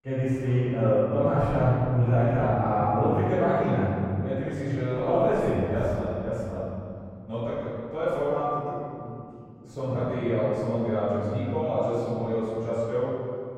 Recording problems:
room echo; strong; dies away in 2.3 s
off-mic speech; far
muffled; very; fading above 3 kHz

